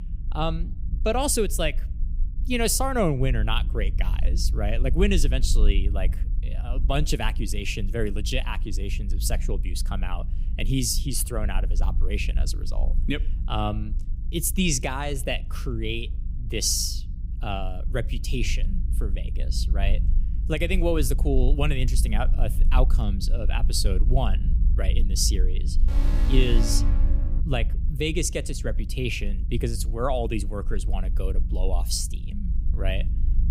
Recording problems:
low rumble; noticeable; throughout; 20 dB below the speech
alarm; loud; from 26 to 27 s; peak 4 dB above the speech

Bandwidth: 15.5 kHz